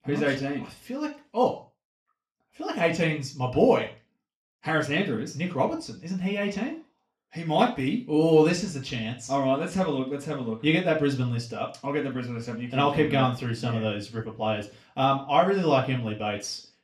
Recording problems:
room echo; slight; dies away in 0.3 s
off-mic speech; somewhat distant

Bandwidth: 13.5 kHz